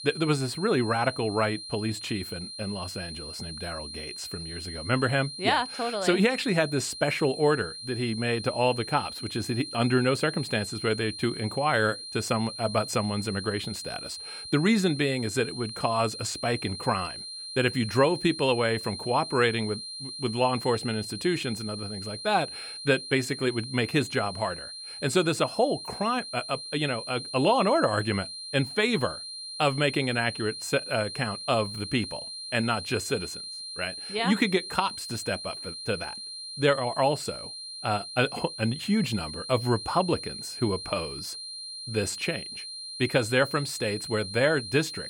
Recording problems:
high-pitched whine; loud; throughout; 4 kHz, 9 dB below the speech

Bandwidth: 17 kHz